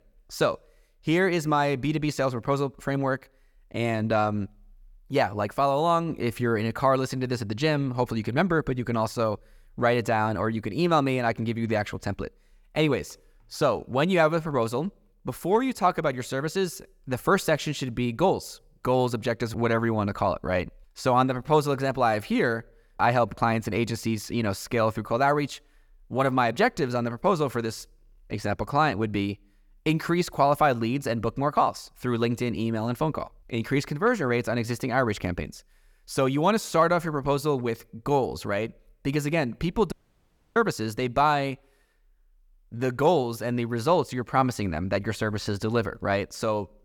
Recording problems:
audio cutting out; at 40 s for 0.5 s

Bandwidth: 18.5 kHz